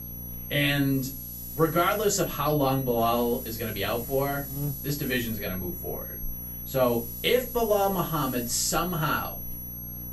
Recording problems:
off-mic speech; far
room echo; very slight; dies away in 0.2 s
high-pitched whine; loud; throughout; 11.5 kHz, 9 dB below the speech
hiss; noticeable; from 1 to 2.5 s, from 3 to 5.5 s and from 7 to 9 s; 20 dB below the speech
electrical hum; faint; throughout; 60 Hz, 25 dB below the speech

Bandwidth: 14.5 kHz